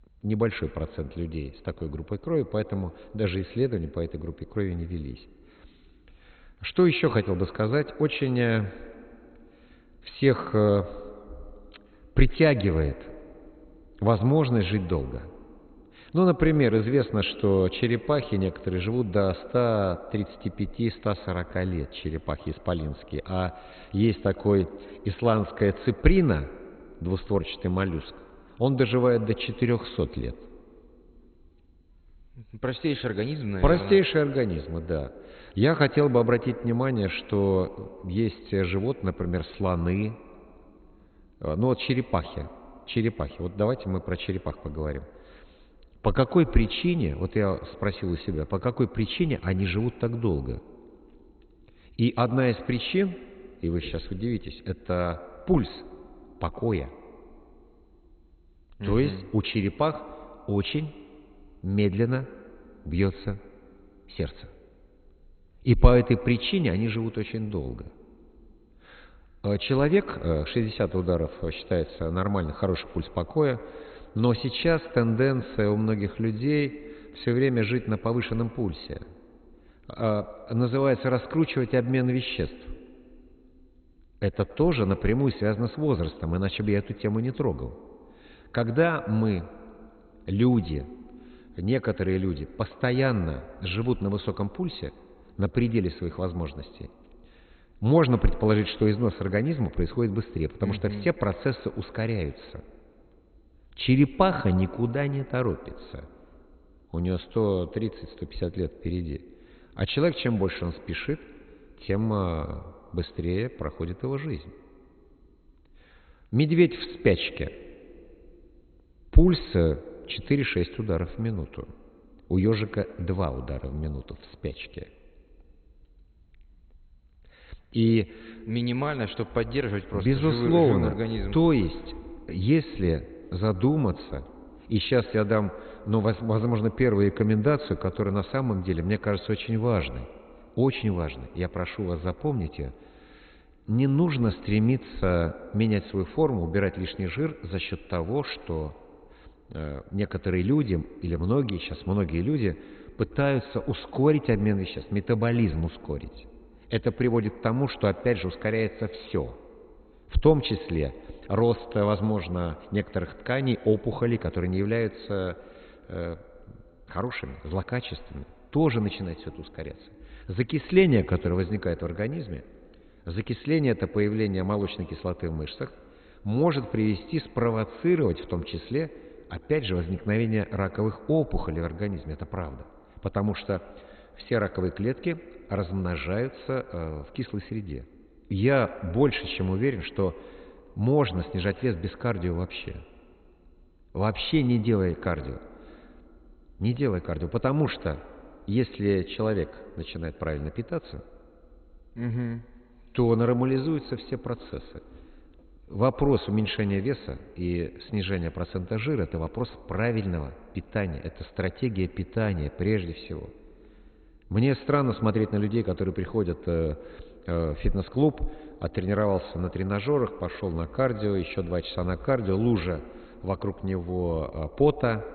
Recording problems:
garbled, watery; badly; nothing above 4 kHz
echo of what is said; noticeable; throughout; 110 ms later, 20 dB below the speech

